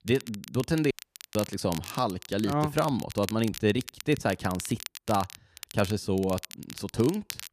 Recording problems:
crackle, like an old record; noticeable; 15 dB below the speech
audio cutting out; at 1 s

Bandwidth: 14.5 kHz